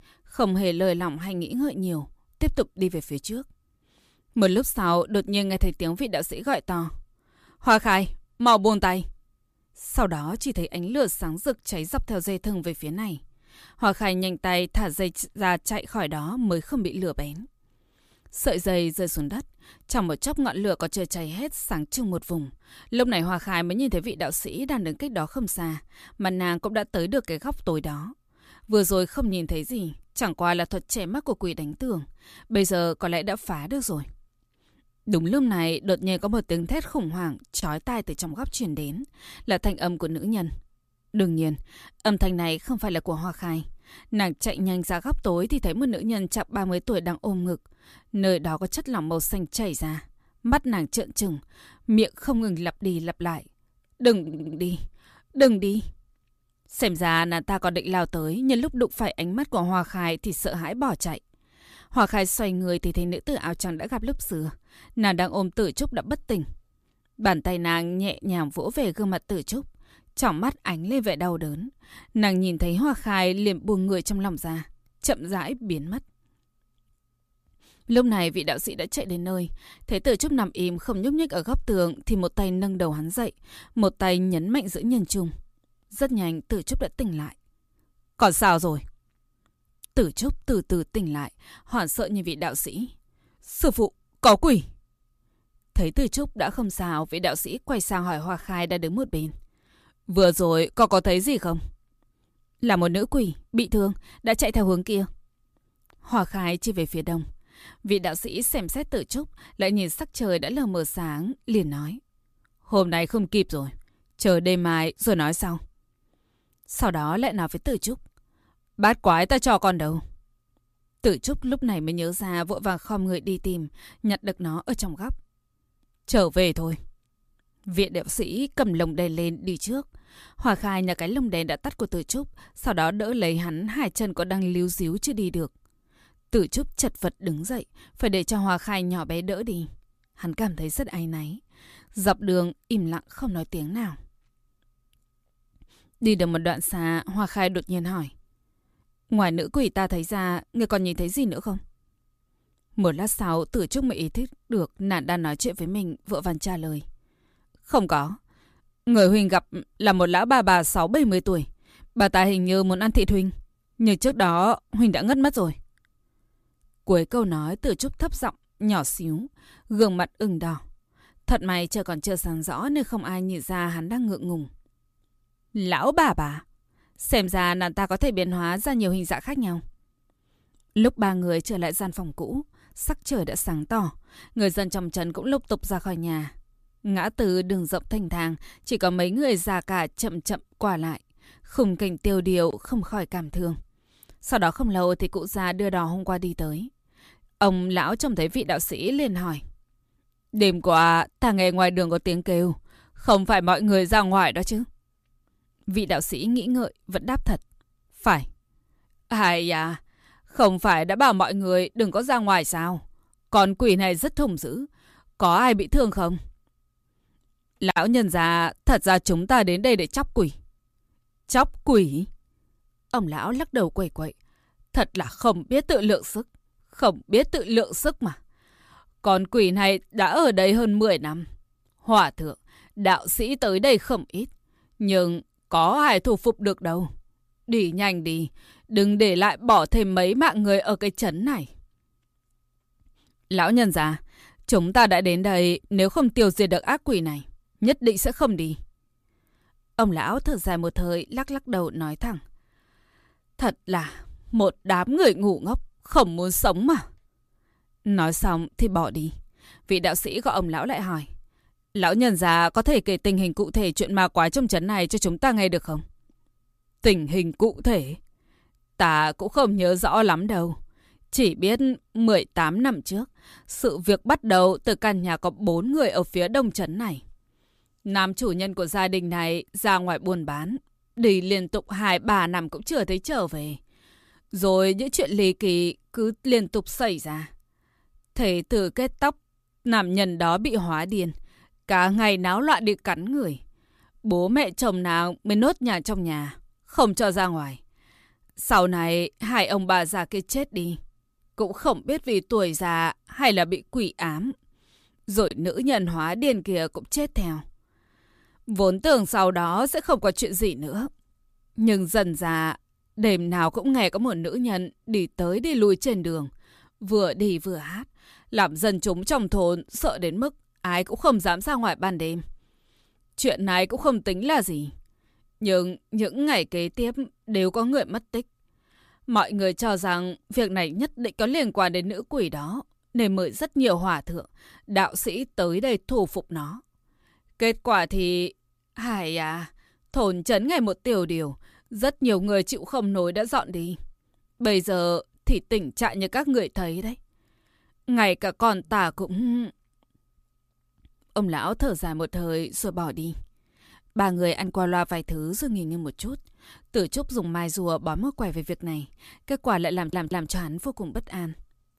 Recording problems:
audio stuttering; at 54 s and at 6:00

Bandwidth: 14.5 kHz